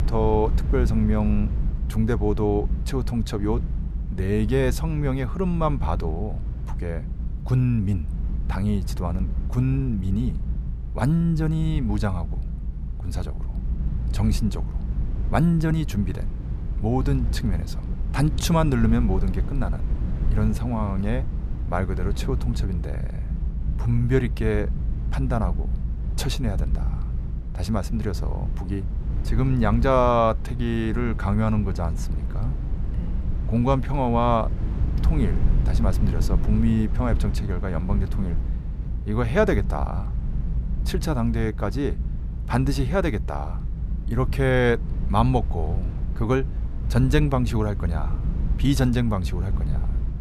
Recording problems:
low rumble; noticeable; throughout; 15 dB below the speech

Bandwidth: 13.5 kHz